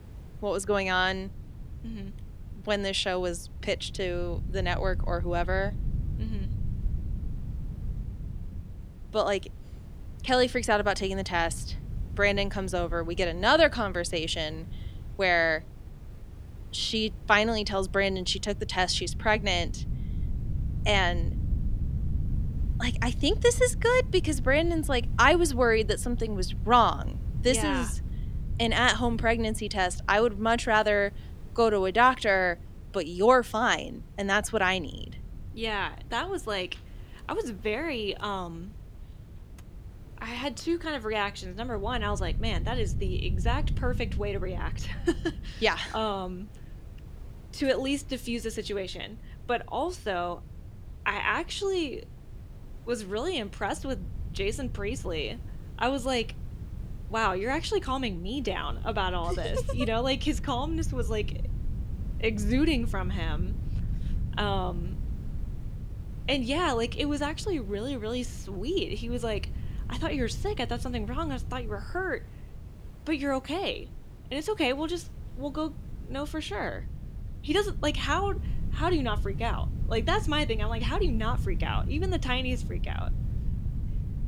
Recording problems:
wind noise on the microphone; occasional gusts; 25 dB below the speech
hiss; faint; throughout; 30 dB below the speech

